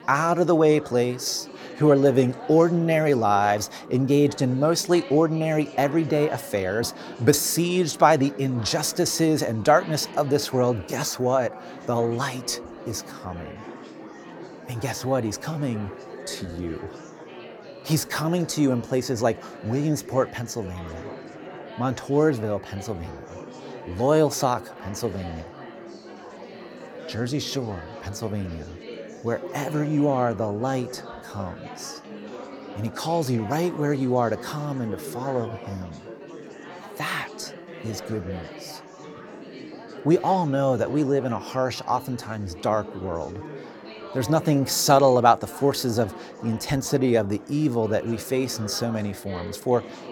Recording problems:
chatter from many people; noticeable; throughout; 15 dB below the speech

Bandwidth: 18 kHz